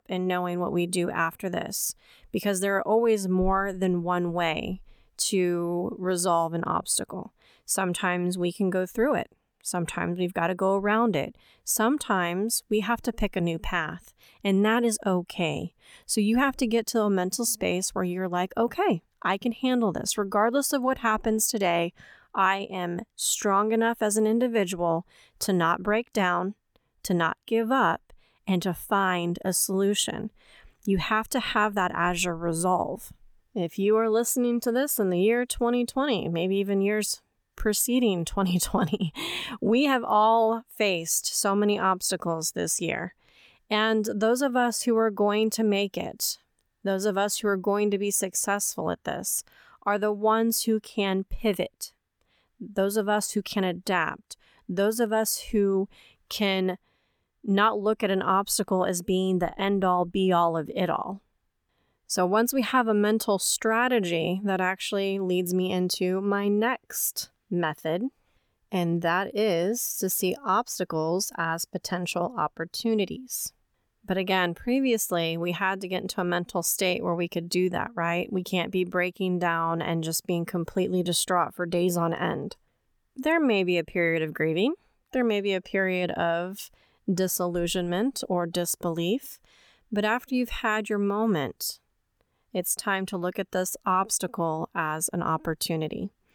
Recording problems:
none

